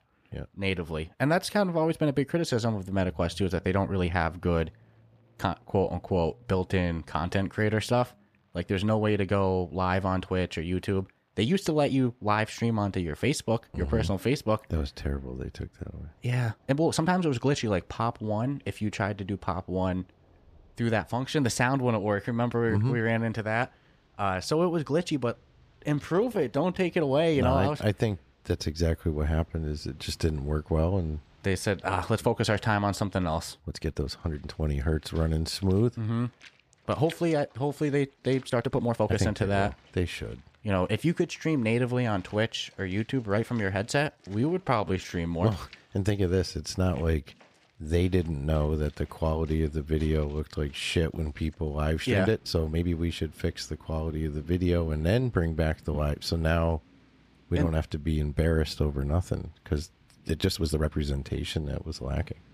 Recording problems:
rain or running water; faint; throughout; 30 dB below the speech
uneven, jittery; strongly; from 5.5 s to 1:01

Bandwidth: 15 kHz